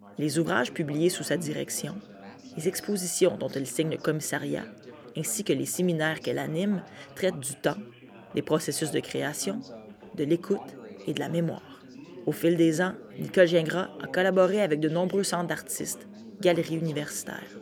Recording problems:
background chatter; noticeable; throughout; 3 voices, 20 dB below the speech

